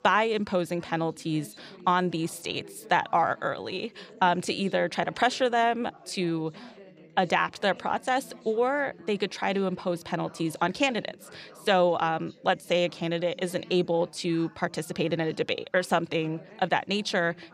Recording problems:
background chatter; faint; throughout; 4 voices, 25 dB below the speech

